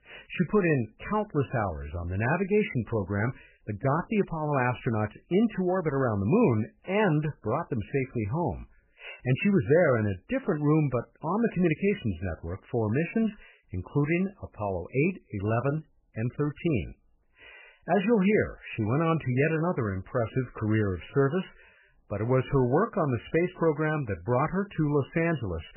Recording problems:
garbled, watery; badly; nothing above 3 kHz

